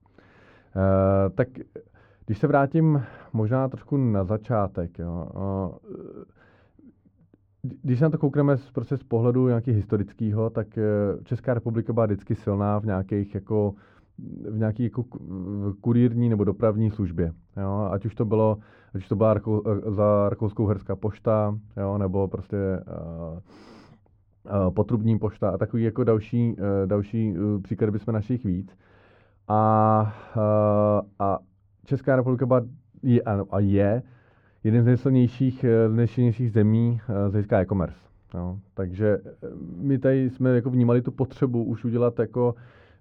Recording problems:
muffled; very; fading above 3 kHz

